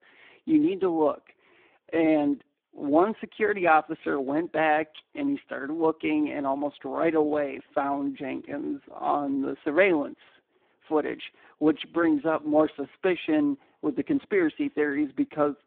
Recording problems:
phone-call audio; poor line

